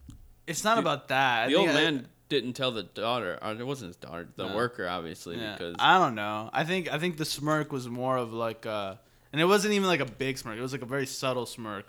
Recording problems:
none

